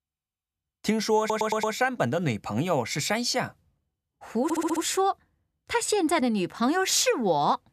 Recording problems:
audio stuttering; at 1 s and at 4.5 s

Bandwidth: 14.5 kHz